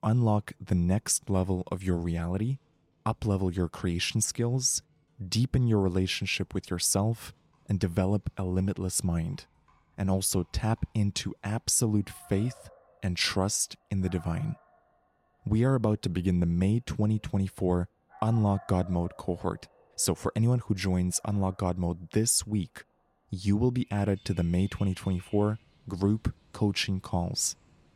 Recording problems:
animal sounds; faint; throughout; 30 dB below the speech

